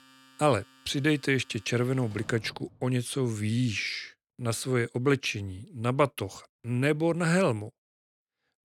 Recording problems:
household noises; faint; until 3 s; 25 dB below the speech

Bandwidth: 17 kHz